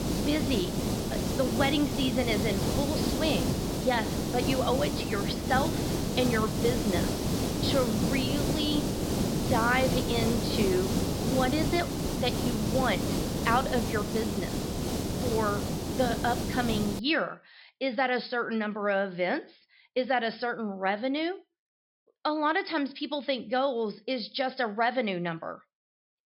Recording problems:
high frequencies cut off; noticeable; nothing above 5.5 kHz
hiss; loud; until 17 s; as loud as the speech

